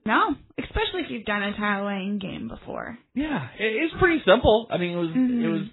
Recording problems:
garbled, watery; badly; nothing above 4 kHz

